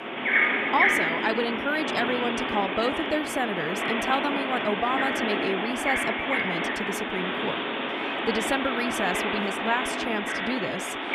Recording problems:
animal sounds; very loud; throughout; 3 dB above the speech

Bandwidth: 14.5 kHz